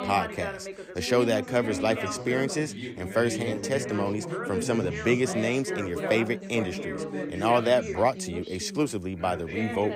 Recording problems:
background chatter; loud; throughout; 3 voices, 6 dB below the speech

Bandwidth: 15.5 kHz